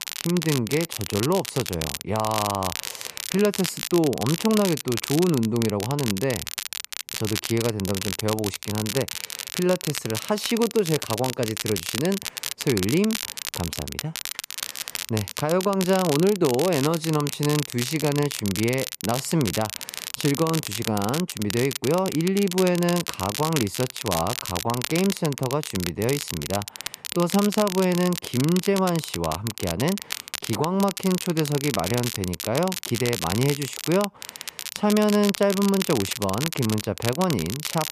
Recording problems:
crackle, like an old record; loud; 6 dB below the speech

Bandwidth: 14.5 kHz